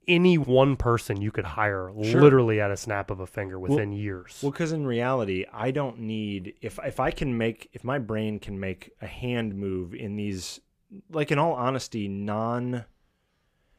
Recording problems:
none

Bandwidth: 15 kHz